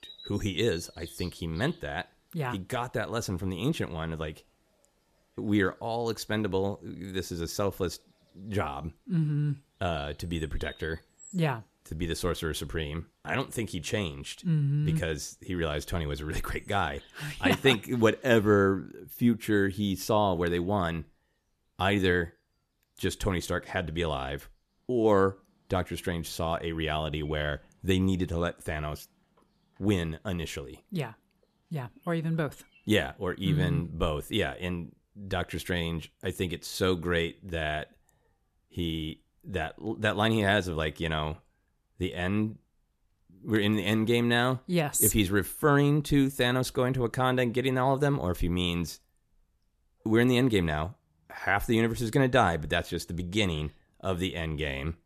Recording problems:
animal sounds; faint; throughout; 25 dB below the speech

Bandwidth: 14 kHz